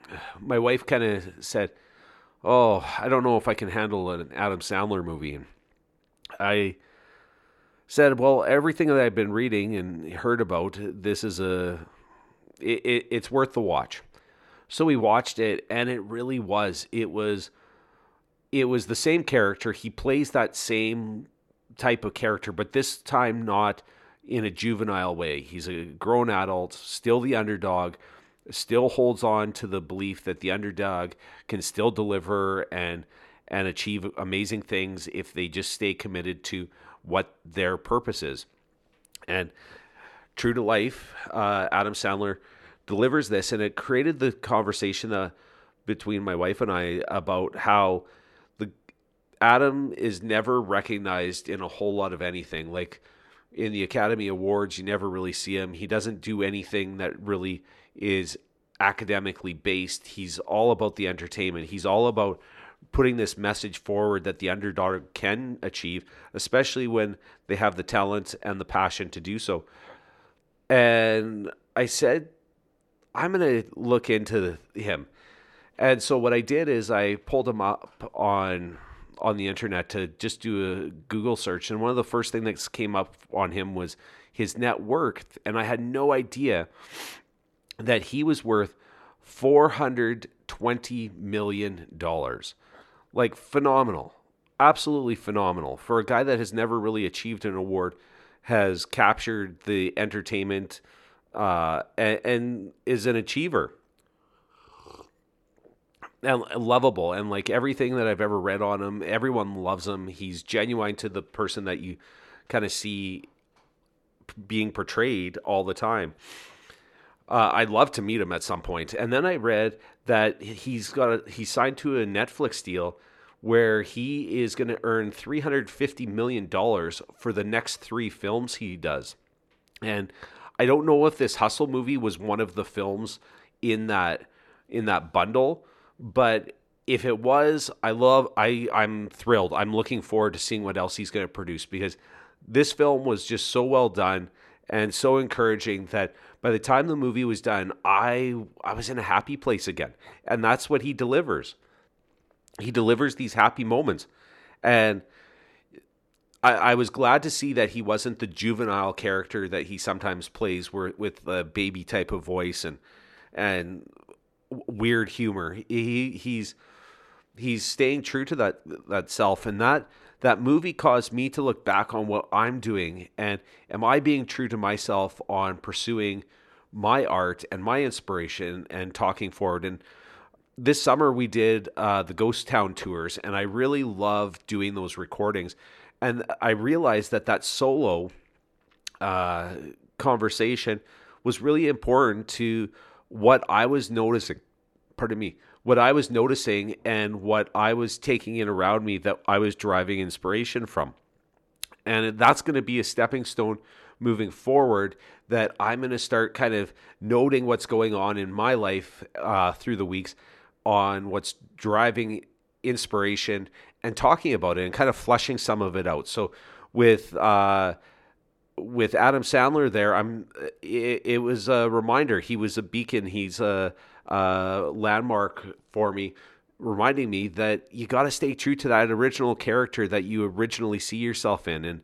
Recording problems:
none

